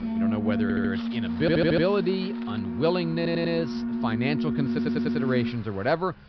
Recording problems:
high frequencies cut off; noticeable; nothing above 5.5 kHz
alarms or sirens; loud; throughout; 1 dB below the speech
traffic noise; faint; throughout; 20 dB below the speech
audio stuttering; 4 times, first at 0.5 s

